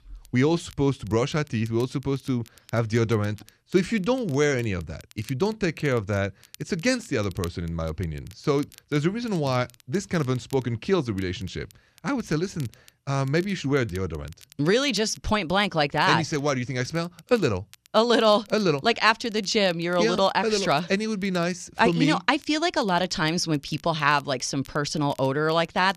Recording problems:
crackle, like an old record; faint; 25 dB below the speech

